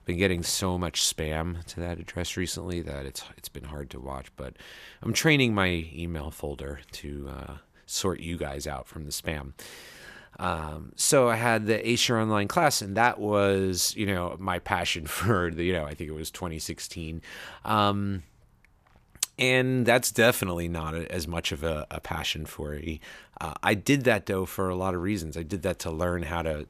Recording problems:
none

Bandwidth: 14.5 kHz